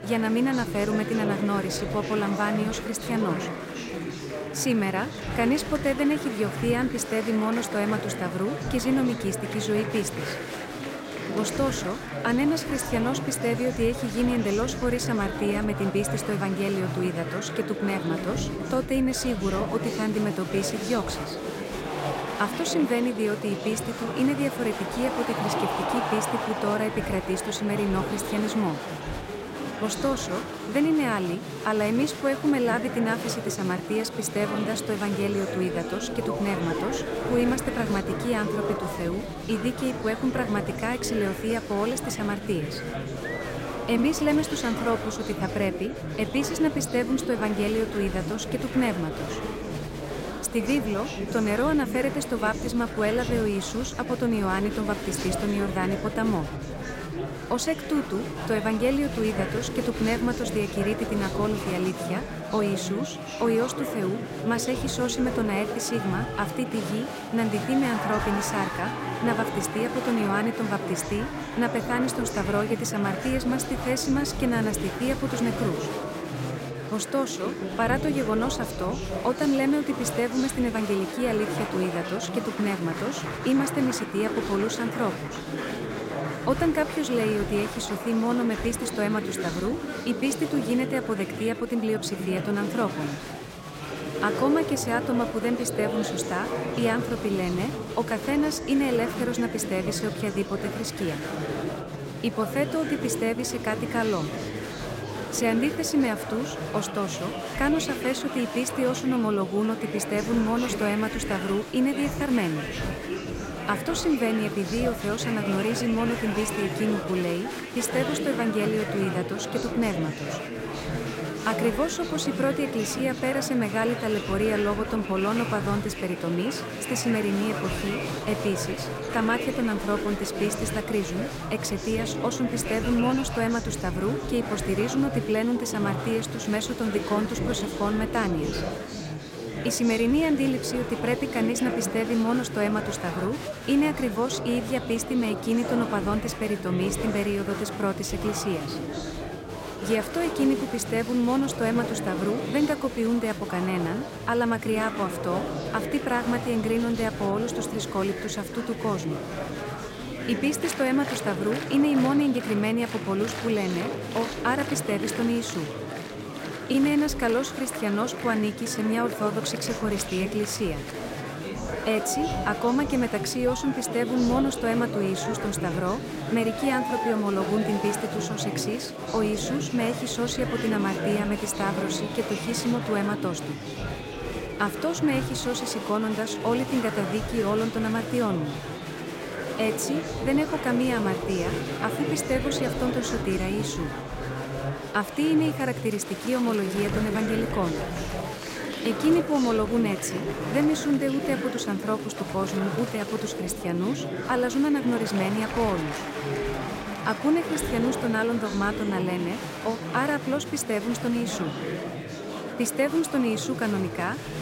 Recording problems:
murmuring crowd; loud; throughout; 5 dB below the speech

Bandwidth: 16 kHz